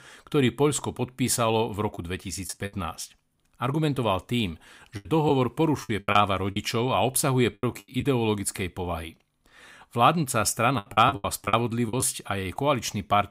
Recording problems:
choppy; very; at 2 s, from 5 to 8 s and from 11 to 12 s; 16% of the speech affected

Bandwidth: 15.5 kHz